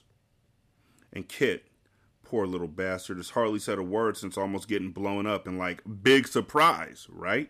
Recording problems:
none

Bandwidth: 14.5 kHz